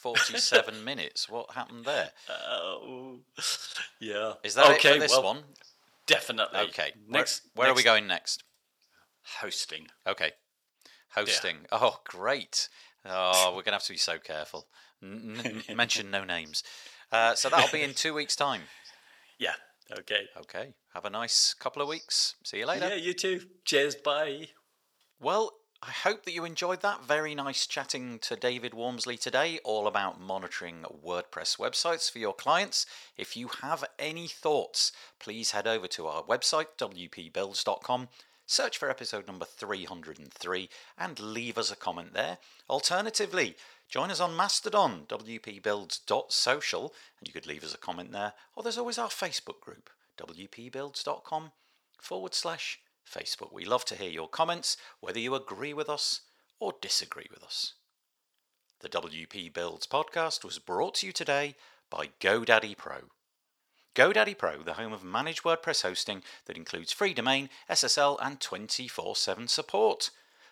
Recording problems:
thin; very; fading below 500 Hz

